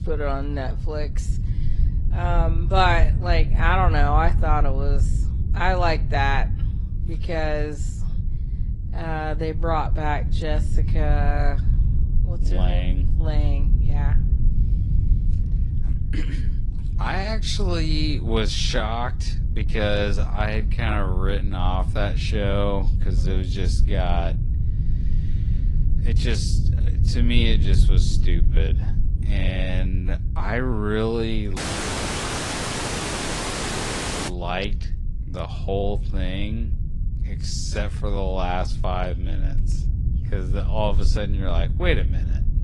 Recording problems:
wrong speed, natural pitch; too slow; 0.7 times normal speed
garbled, watery; slightly; nothing above 11 kHz
low rumble; noticeable; throughout; 15 dB below the speech
audio cutting out; at 32 s for 2.5 s

